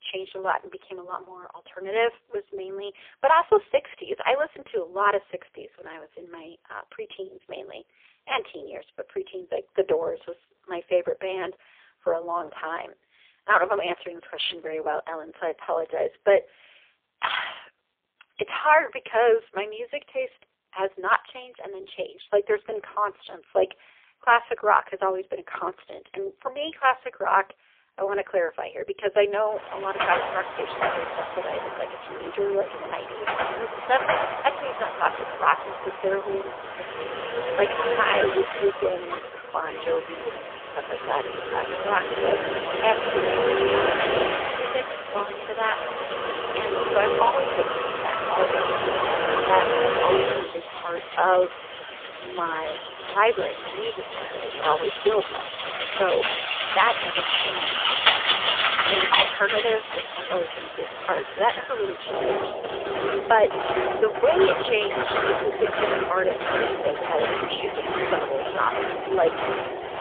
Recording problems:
phone-call audio; poor line; nothing above 3.5 kHz
traffic noise; loud; from 30 s on; 1 dB below the speech

